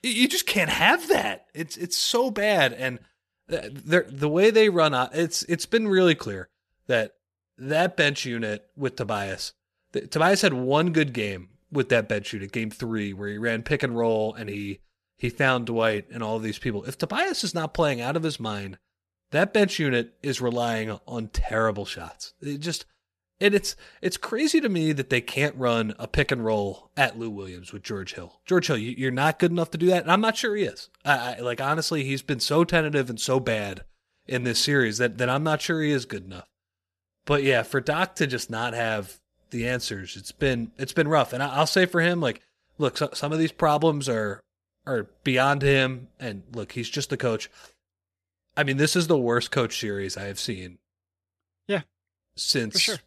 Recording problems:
none

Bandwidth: 13.5 kHz